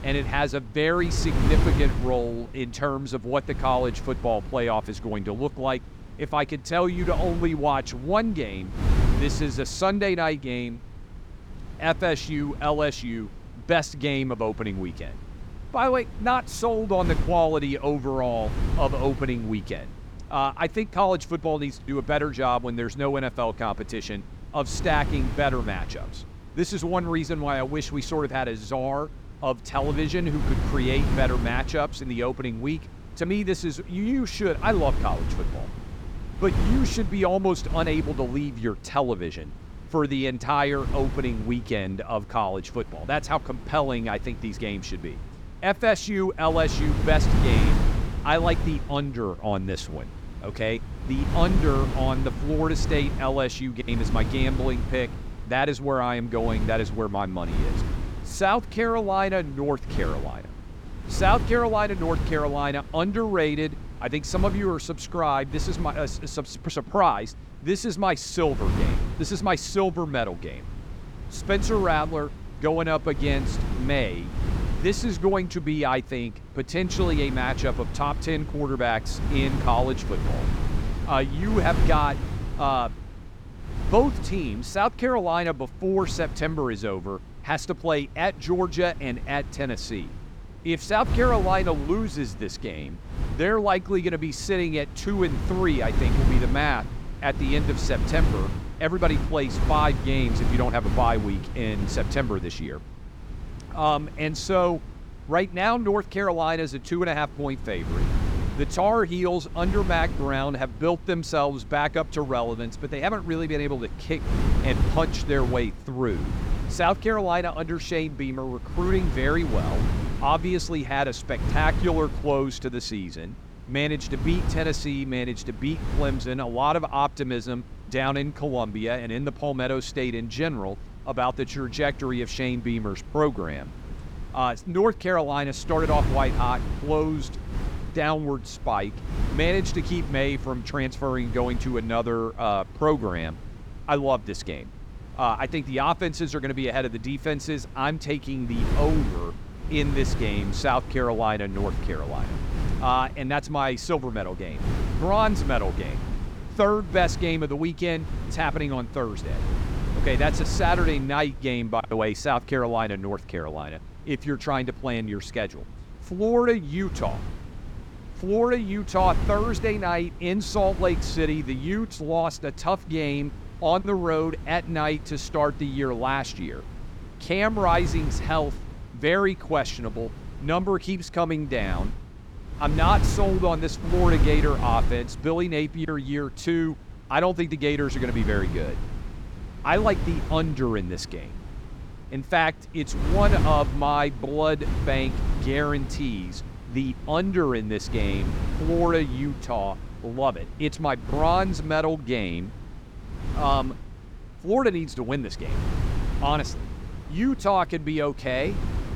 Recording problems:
wind noise on the microphone; occasional gusts; 15 dB below the speech

